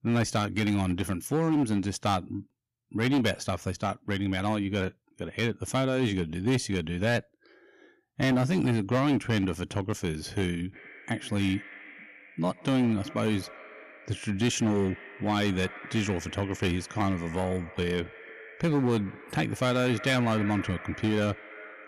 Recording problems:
echo of what is said; noticeable; from 11 s on; 130 ms later, 15 dB below the speech
distortion; slight; 7% of the sound clipped

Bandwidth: 15 kHz